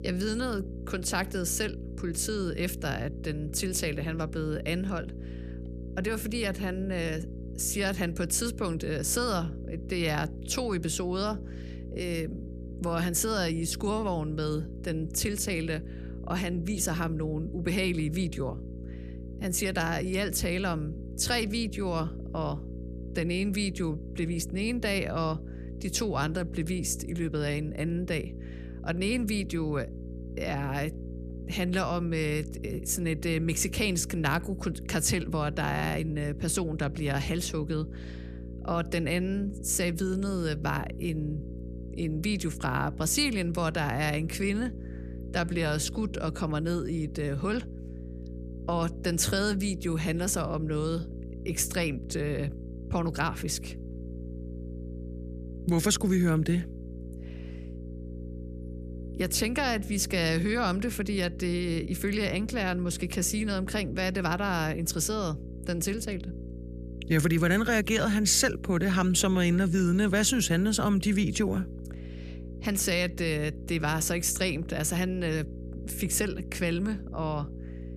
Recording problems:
electrical hum; noticeable; throughout; 60 Hz, 15 dB below the speech

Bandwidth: 14.5 kHz